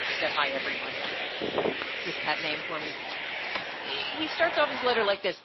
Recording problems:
thin; somewhat; fading below 450 Hz
garbled, watery; slightly; nothing above 5.5 kHz
traffic noise; loud; throughout; 2 dB below the speech
wind noise on the microphone; occasional gusts; 15 dB below the speech

